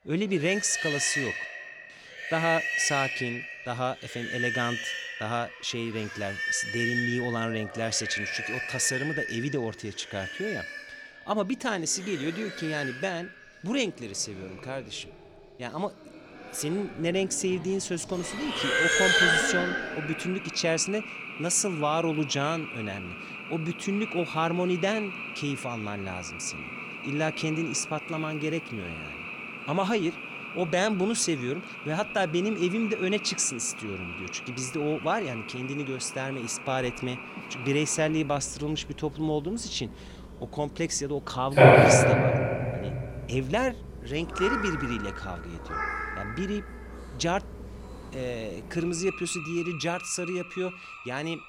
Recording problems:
animal sounds; very loud; throughout; as loud as the speech

